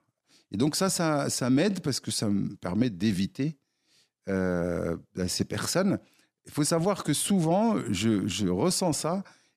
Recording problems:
none

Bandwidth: 14.5 kHz